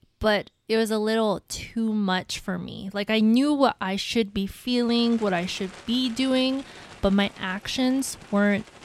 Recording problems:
animal sounds; faint; throughout; 20 dB below the speech

